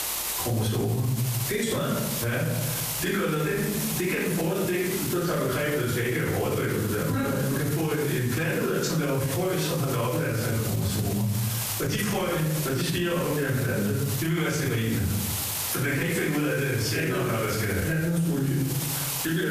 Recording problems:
off-mic speech; far
room echo; noticeable; dies away in 0.7 s
squashed, flat; somewhat
hiss; loud; throughout; 7 dB below the speech
electrical hum; faint; until 8 s and from 11 s on; 50 Hz, 25 dB below the speech
abrupt cut into speech; at the end

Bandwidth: 14.5 kHz